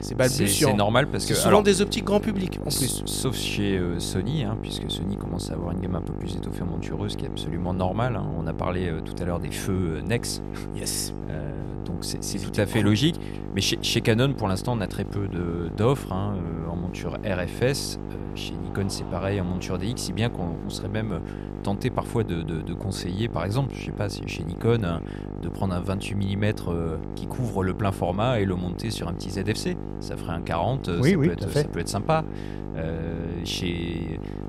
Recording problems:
electrical hum; noticeable; throughout; 50 Hz, 10 dB below the speech
murmuring crowd; faint; throughout; 25 dB below the speech

